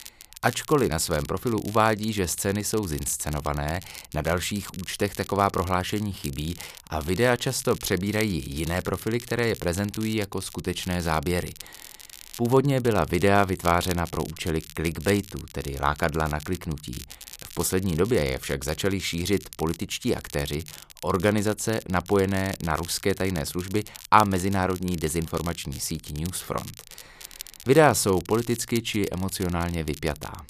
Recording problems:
crackle, like an old record; noticeable; 15 dB below the speech

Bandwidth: 14.5 kHz